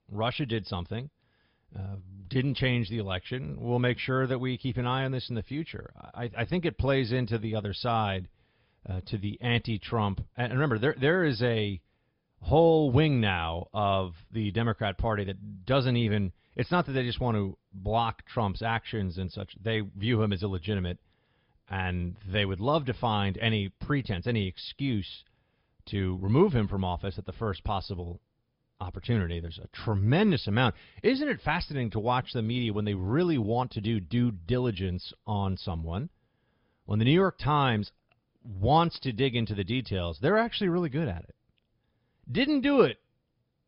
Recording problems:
high frequencies cut off; noticeable; nothing above 5.5 kHz

